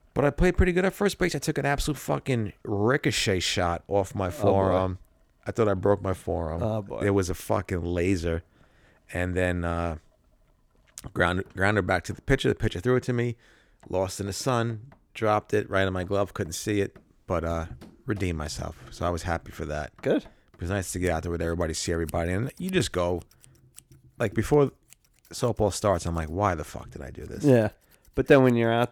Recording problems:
household noises; faint; throughout; 30 dB below the speech

